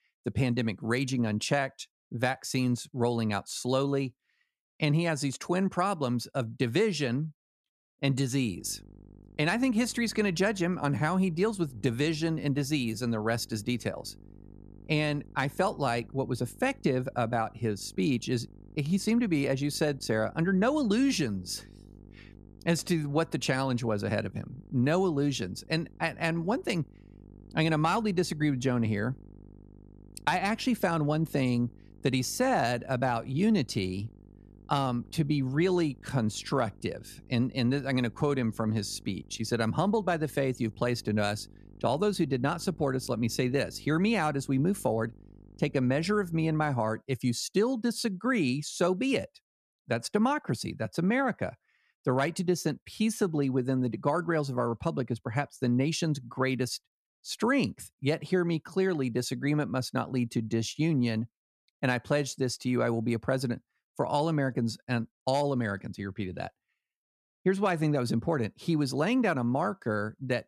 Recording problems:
electrical hum; faint; from 8.5 to 47 s; 50 Hz, 30 dB below the speech

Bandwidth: 13.5 kHz